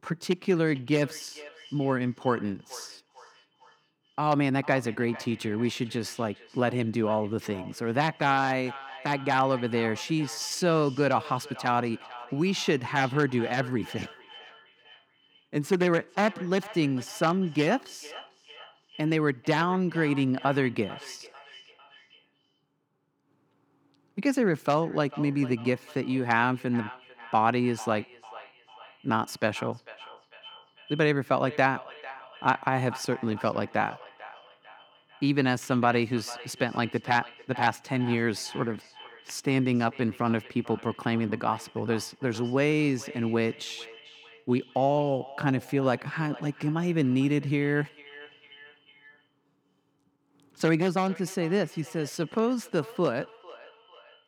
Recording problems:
echo of what is said; faint; throughout; 450 ms later, 20 dB below the speech

